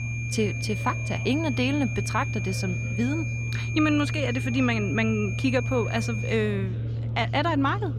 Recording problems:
high-pitched whine; loud; until 6.5 s; 2.5 kHz, 8 dB below the speech
chatter from many people; noticeable; throughout; 20 dB below the speech
low rumble; noticeable; throughout; 15 dB below the speech

